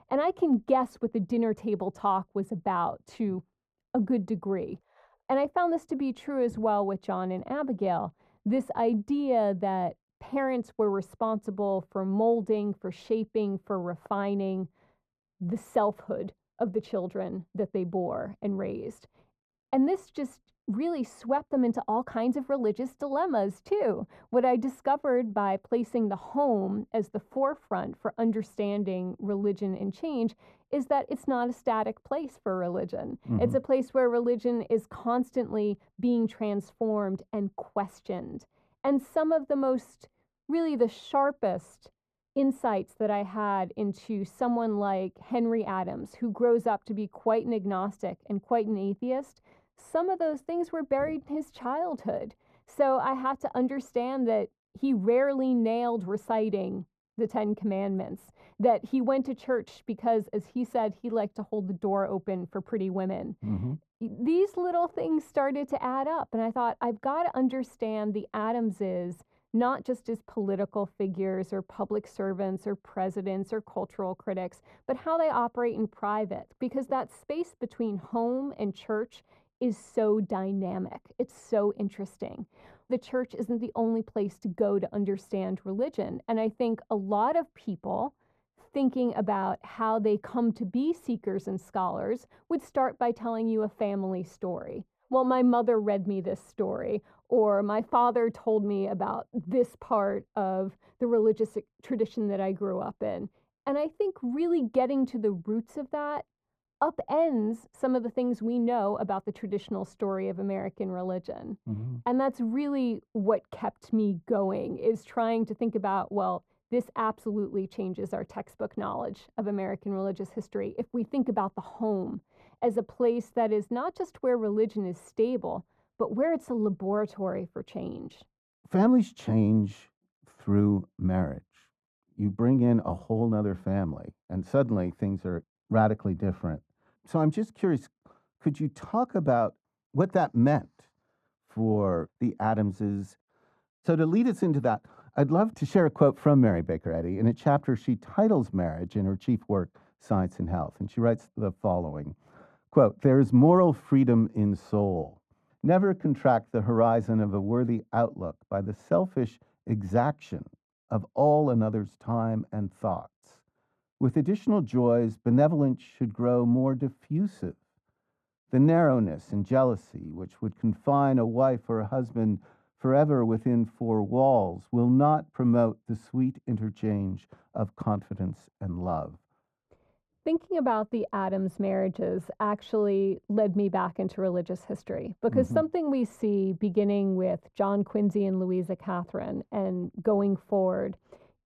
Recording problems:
muffled; very; fading above 1.5 kHz

